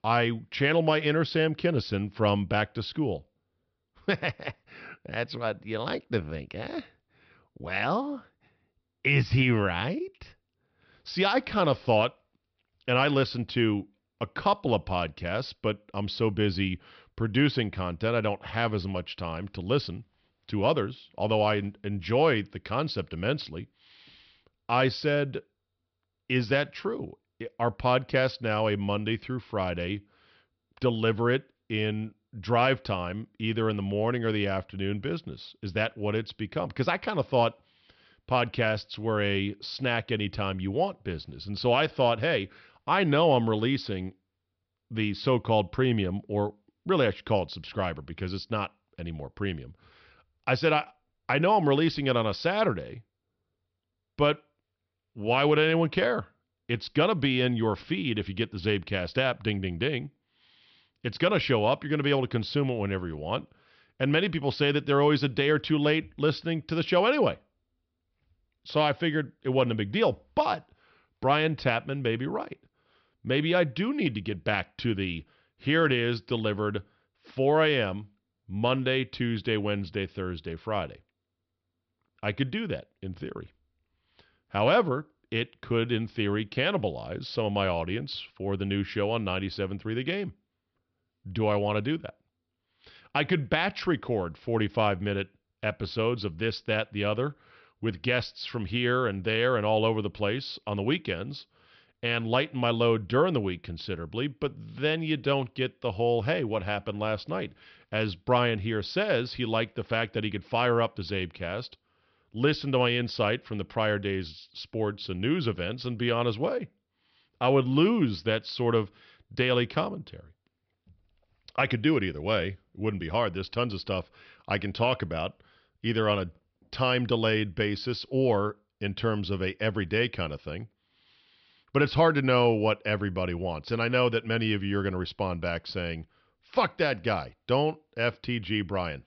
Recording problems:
high frequencies cut off; noticeable; nothing above 5.5 kHz

